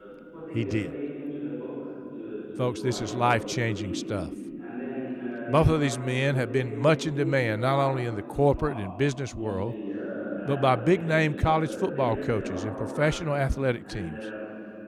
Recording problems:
voice in the background; loud; throughout; 9 dB below the speech

